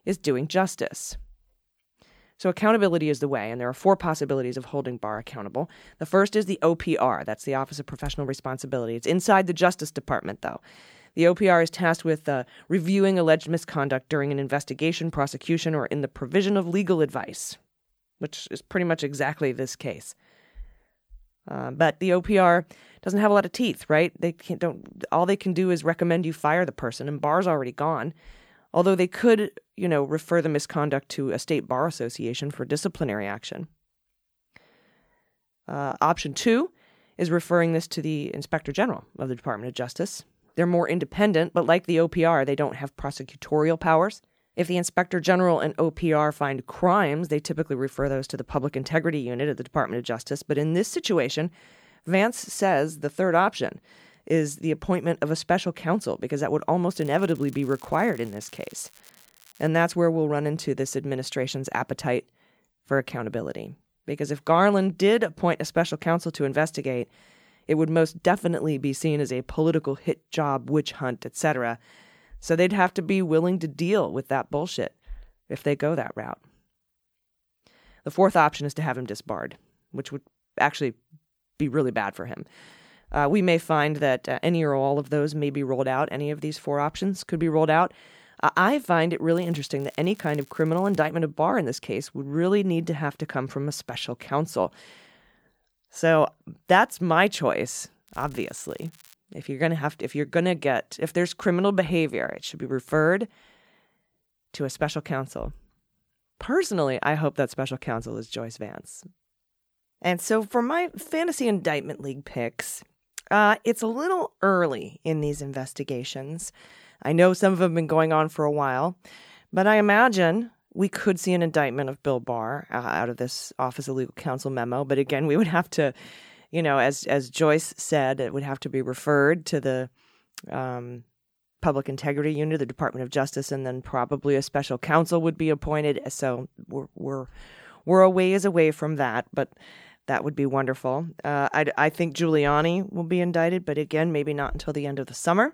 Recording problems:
crackling; faint; from 57 s to 1:00, from 1:29 to 1:31 and from 1:38 to 1:39; 25 dB below the speech

